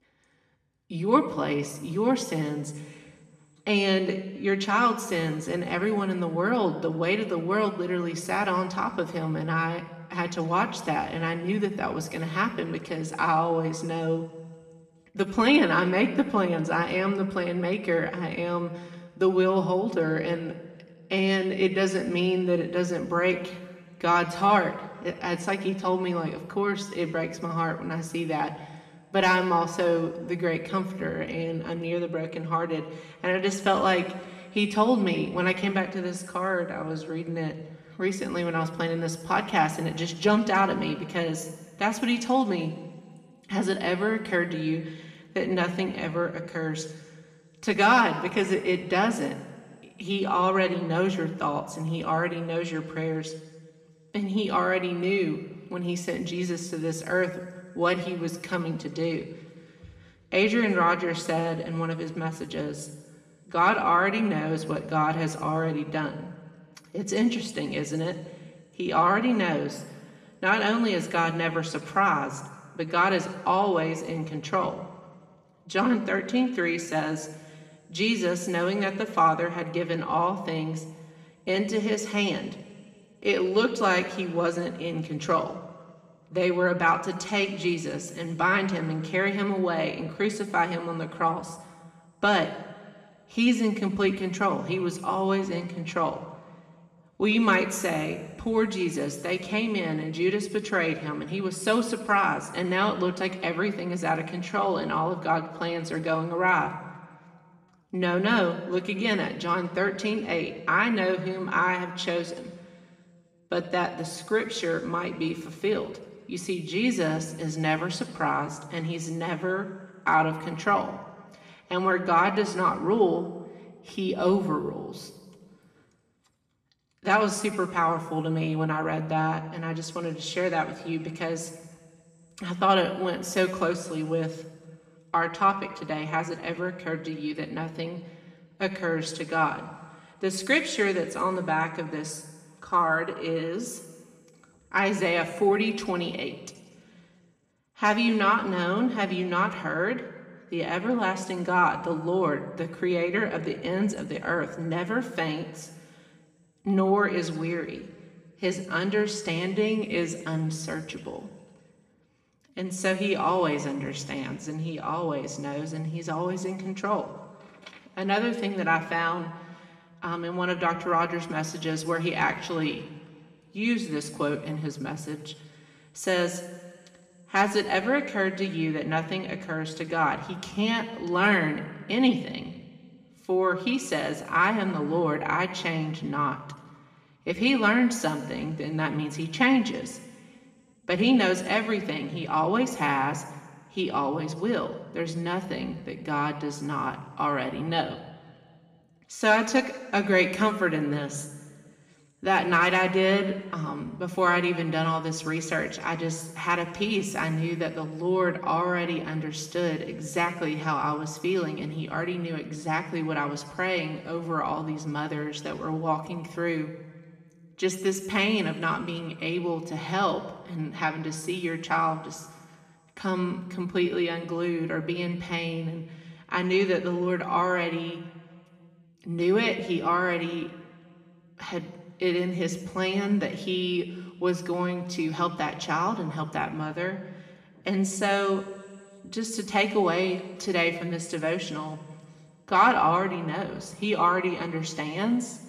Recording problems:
room echo; slight; dies away in 1.3 s
off-mic speech; somewhat distant

